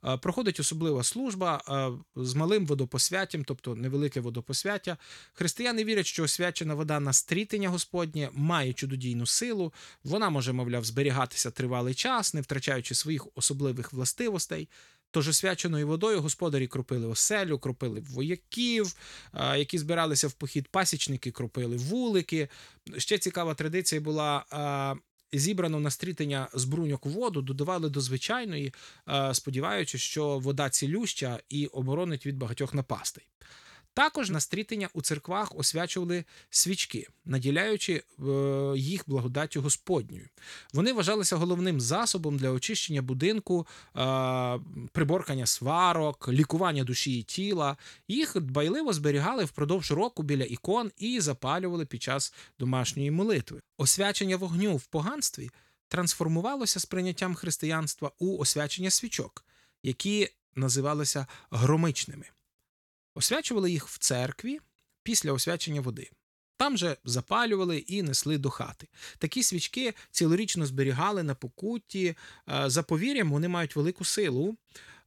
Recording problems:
none

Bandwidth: 18.5 kHz